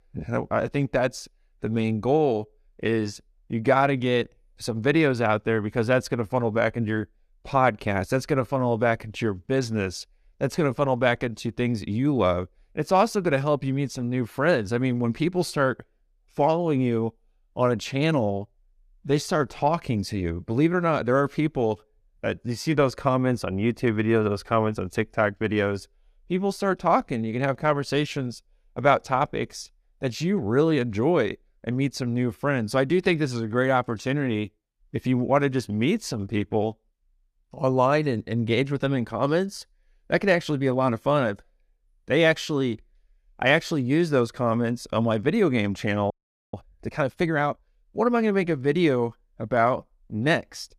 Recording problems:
audio freezing; at 46 s

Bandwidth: 14.5 kHz